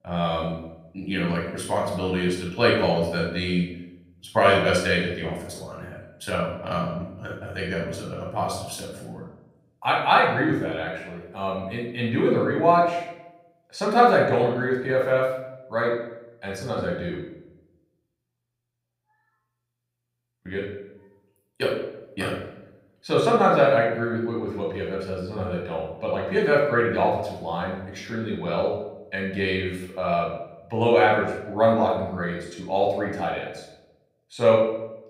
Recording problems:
off-mic speech; far
room echo; noticeable; dies away in 0.7 s
echo of what is said; faint; throughout; 160 ms later, 25 dB below the speech

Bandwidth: 15.5 kHz